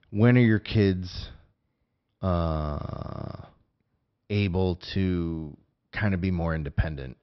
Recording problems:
high frequencies cut off; noticeable; nothing above 5.5 kHz

